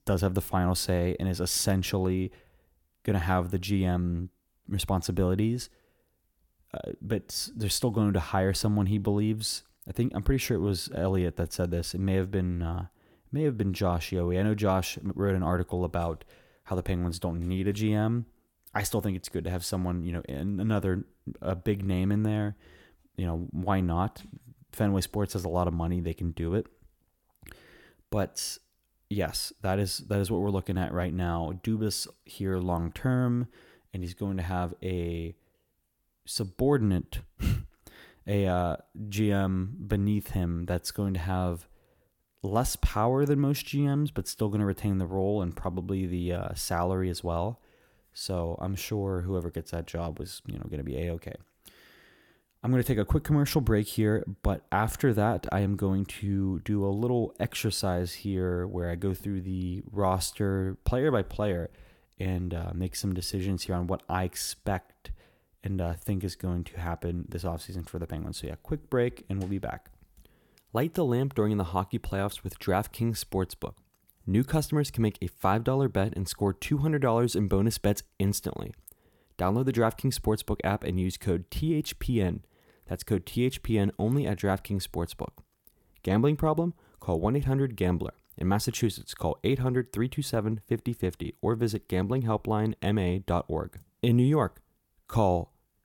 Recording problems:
none

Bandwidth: 17 kHz